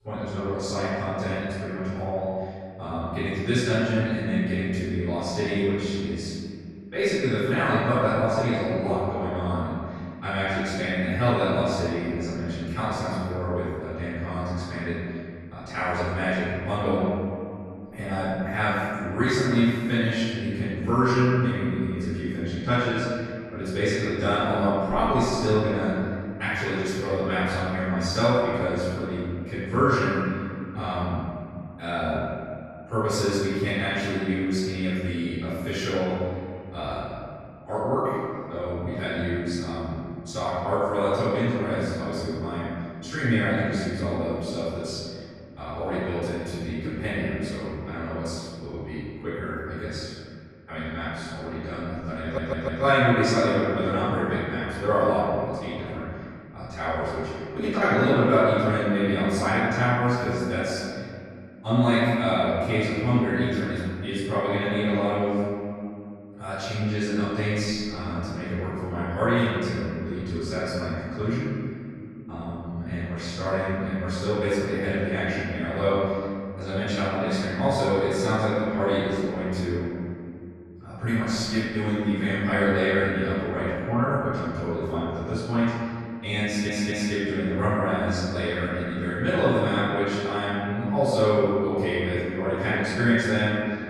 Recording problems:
room echo; strong; dies away in 2.4 s
off-mic speech; far
audio stuttering; at 52 s and at 1:26

